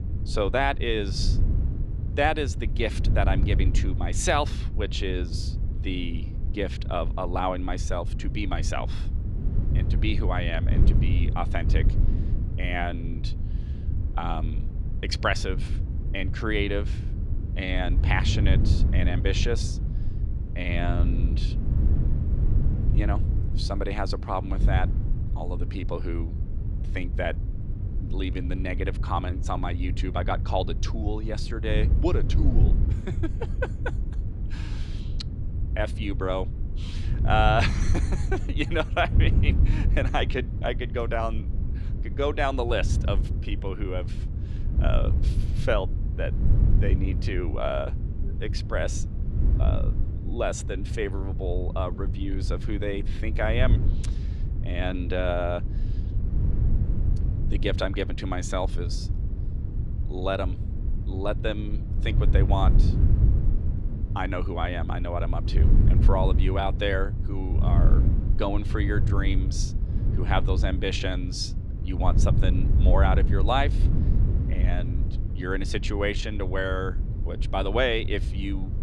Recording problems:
wind noise on the microphone; occasional gusts; 10 dB below the speech

